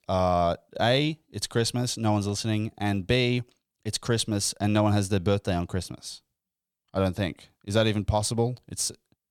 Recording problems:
none

